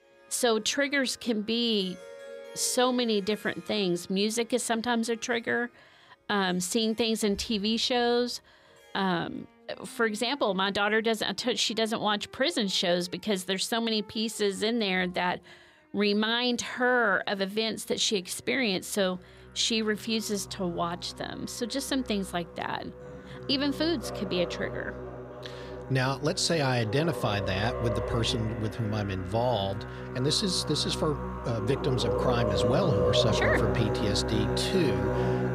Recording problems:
background music; loud; throughout; 5 dB below the speech

